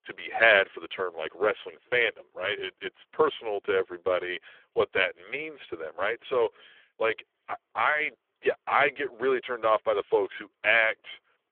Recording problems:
phone-call audio; poor line

